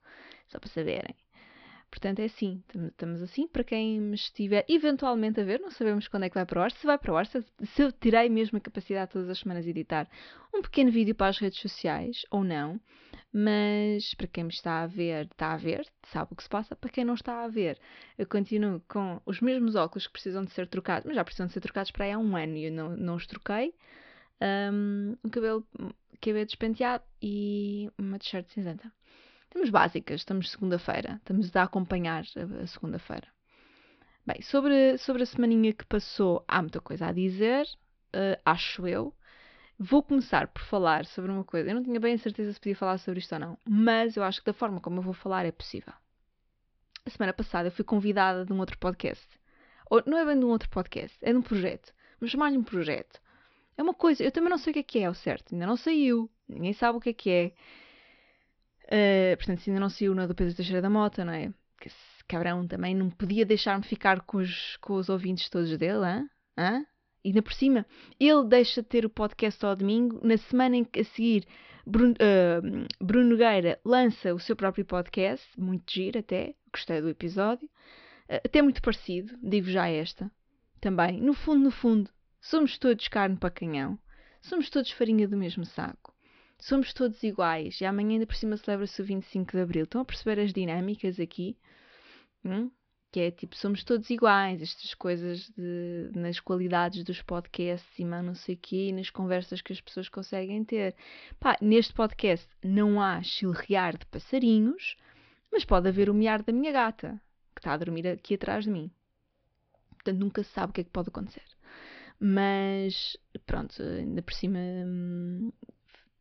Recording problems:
high frequencies cut off; noticeable; nothing above 5.5 kHz

